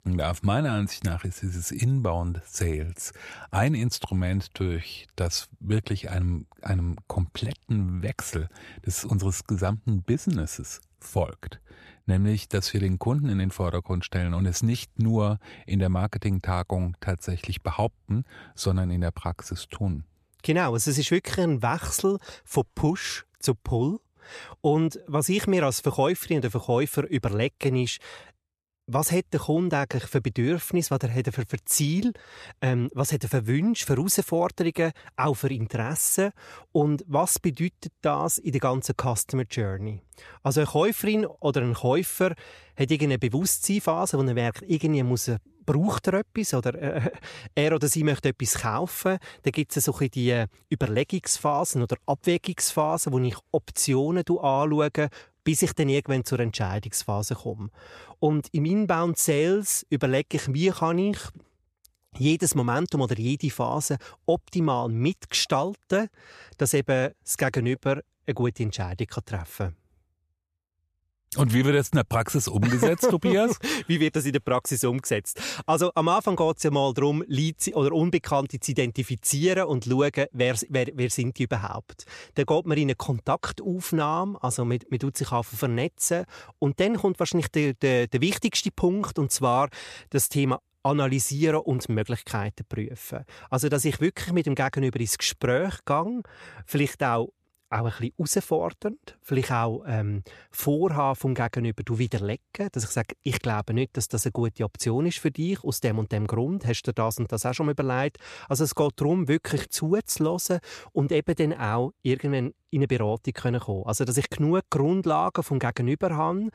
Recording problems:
none

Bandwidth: 14.5 kHz